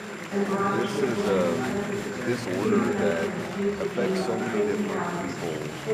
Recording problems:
chatter from many people; very loud; throughout; 4 dB above the speech
high-pitched whine; noticeable; throughout; 7.5 kHz, 20 dB below the speech

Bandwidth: 15 kHz